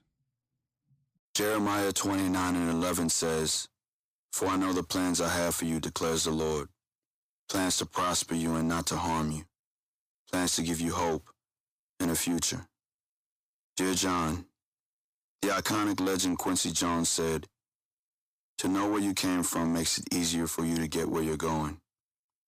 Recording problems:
distortion; slight; 10 dB below the speech

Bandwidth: 15 kHz